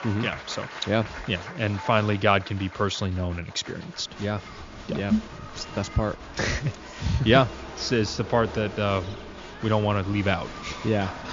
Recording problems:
high frequencies cut off; noticeable; nothing above 7 kHz
crowd noise; noticeable; throughout; 15 dB below the speech

